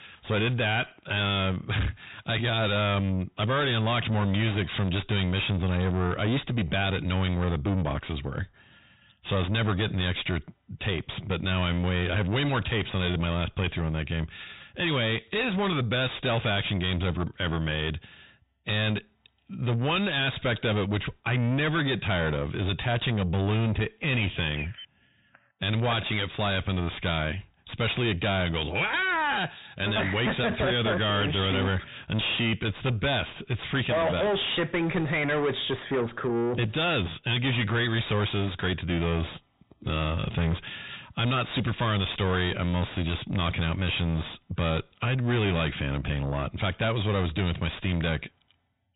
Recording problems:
distortion; heavy; 6 dB below the speech
high frequencies cut off; severe; nothing above 4 kHz

